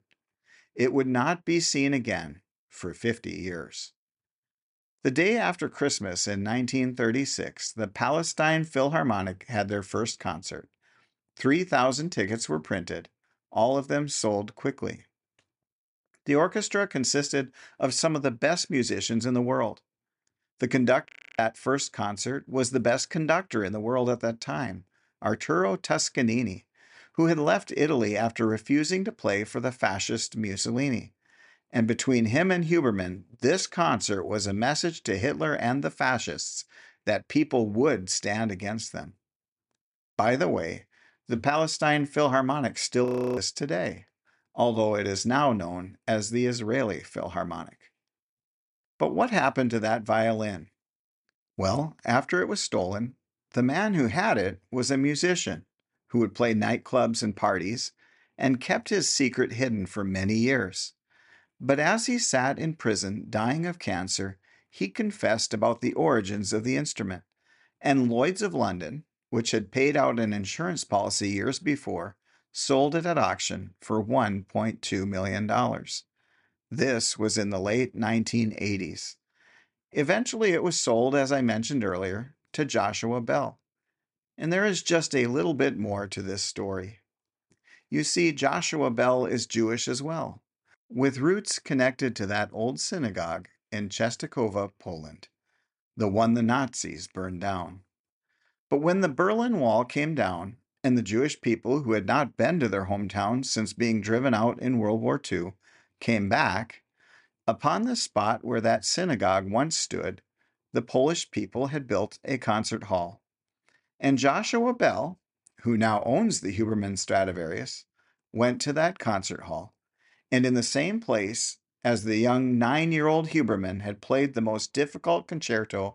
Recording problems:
audio freezing; at 21 s and at 43 s

